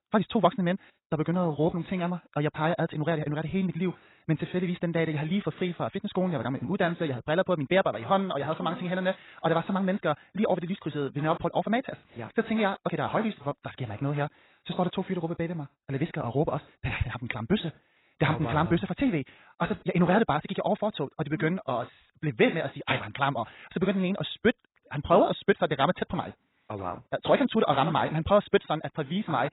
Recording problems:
garbled, watery; badly; nothing above 4 kHz
wrong speed, natural pitch; too fast; 1.6 times normal speed

